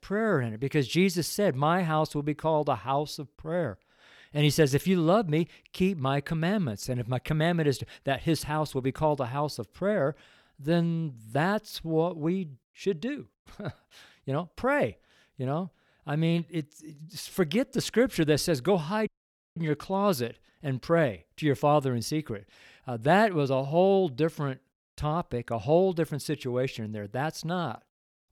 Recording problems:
audio cutting out; at 19 s

